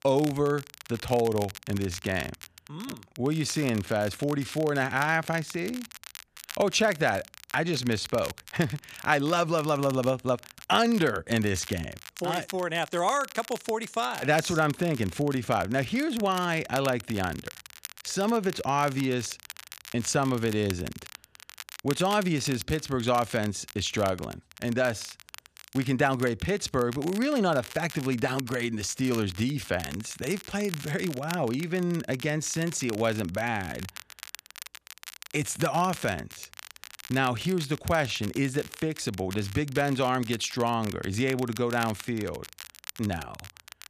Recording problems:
crackle, like an old record; noticeable; 15 dB below the speech

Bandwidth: 14.5 kHz